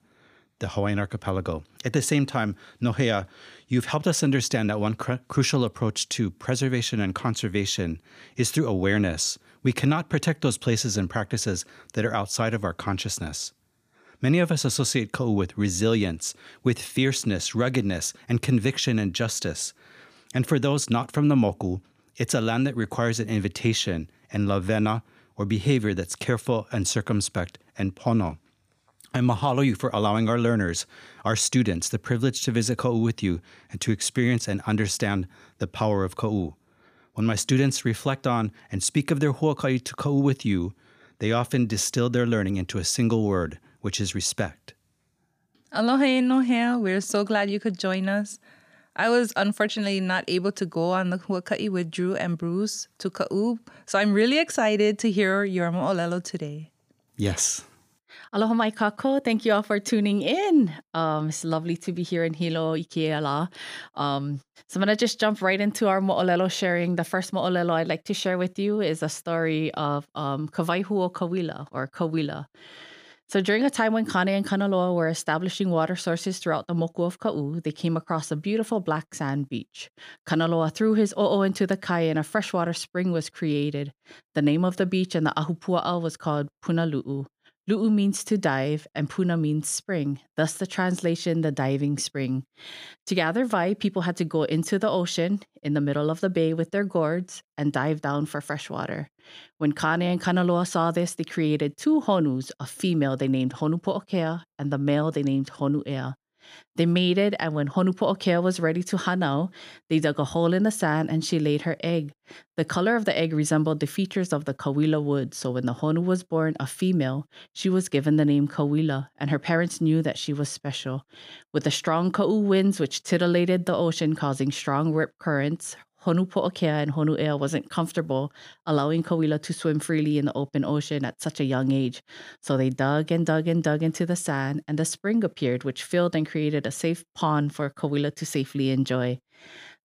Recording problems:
none

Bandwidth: 15 kHz